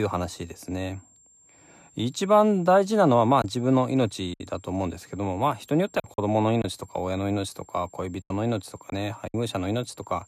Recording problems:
high-pitched whine; faint; throughout; 7.5 kHz, 30 dB below the speech
choppy; occasionally; 4% of the speech affected
abrupt cut into speech; at the start

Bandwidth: 14 kHz